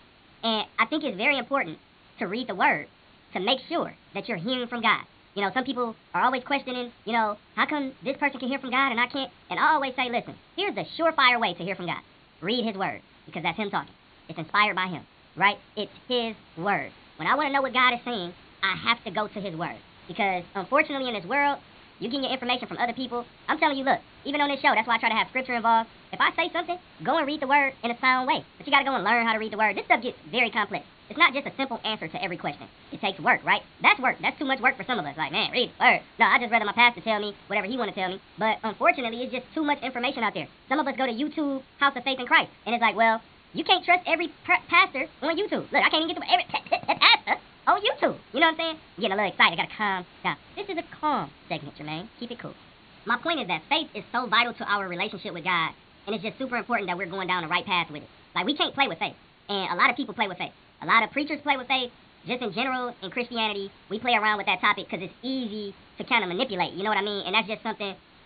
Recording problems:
high frequencies cut off; severe; nothing above 4.5 kHz
wrong speed and pitch; too fast and too high; 1.5 times normal speed
hiss; faint; throughout; 25 dB below the speech

